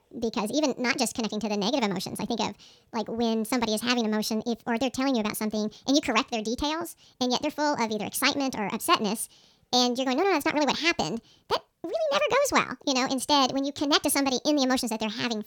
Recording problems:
wrong speed and pitch; too fast and too high; 1.5 times normal speed

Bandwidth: 19 kHz